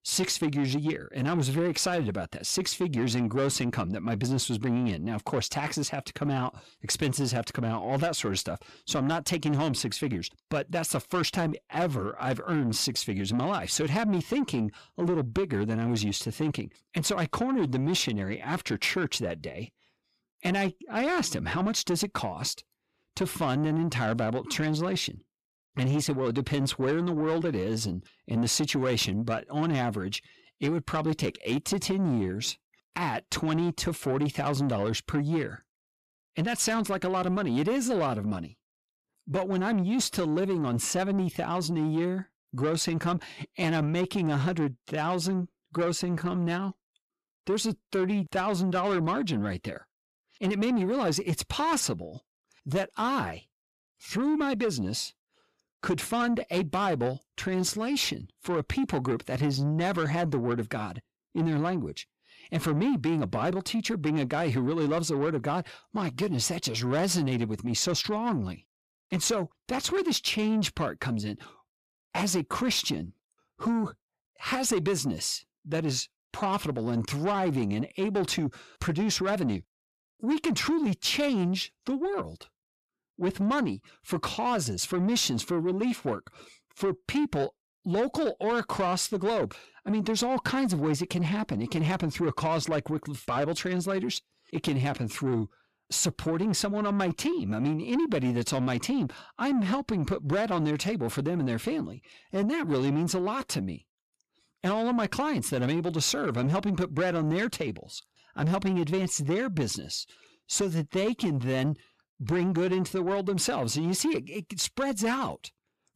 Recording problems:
distortion; slight; 10 dB below the speech

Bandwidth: 14.5 kHz